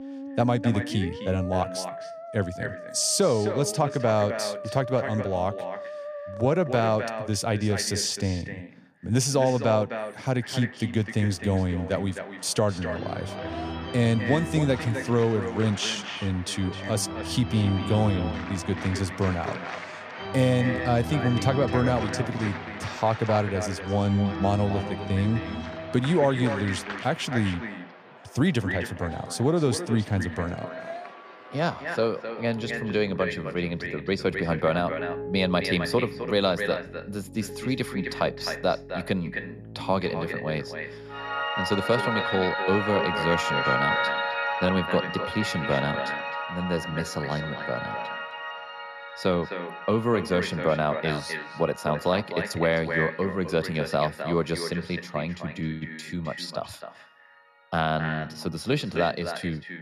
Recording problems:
echo of what is said; strong; throughout; 260 ms later, 9 dB below the speech
background music; loud; throughout; 7 dB below the speech

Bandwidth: 14.5 kHz